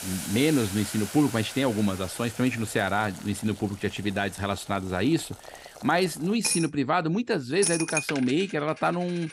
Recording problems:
household noises; loud; throughout; 6 dB below the speech

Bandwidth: 15.5 kHz